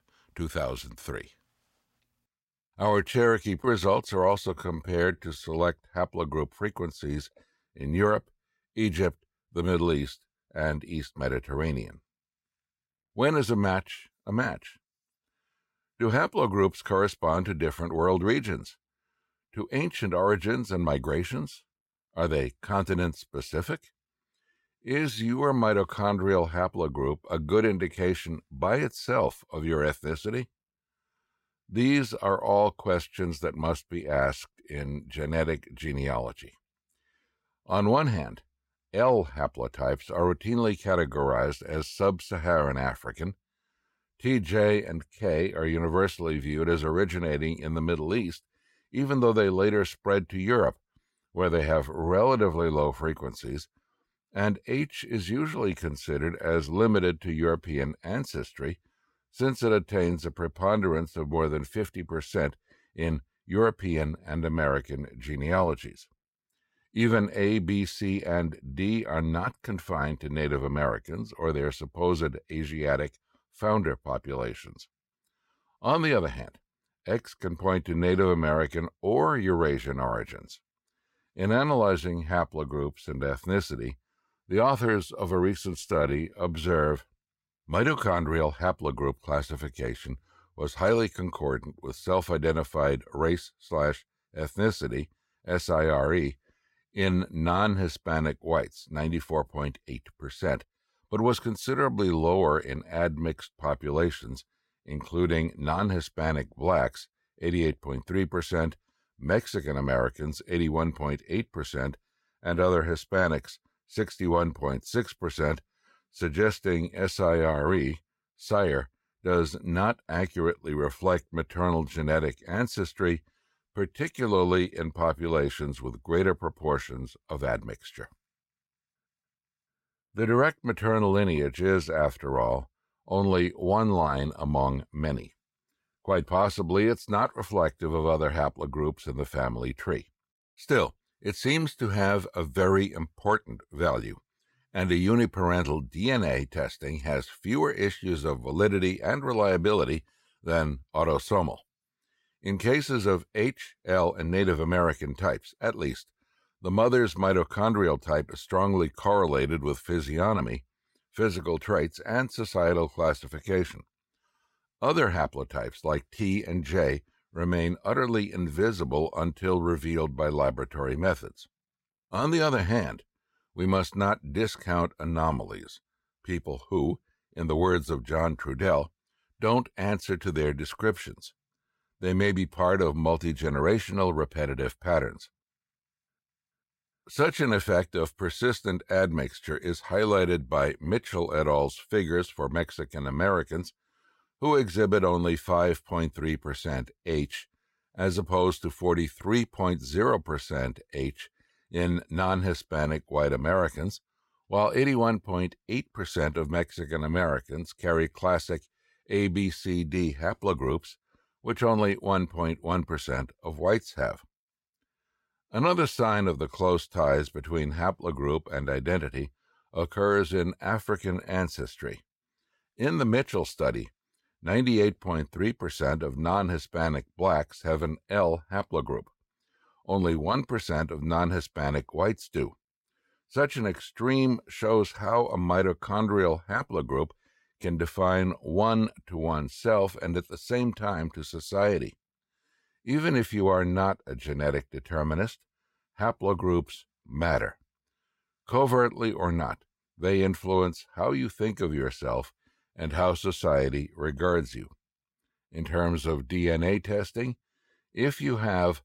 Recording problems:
uneven, jittery; strongly; from 4.5 s to 1:27

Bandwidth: 16 kHz